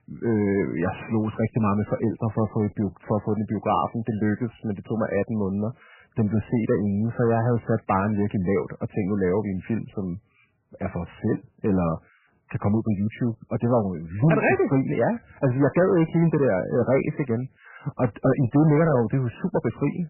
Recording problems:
garbled, watery; badly; nothing above 2.5 kHz
distortion; slight; 10 dB below the speech

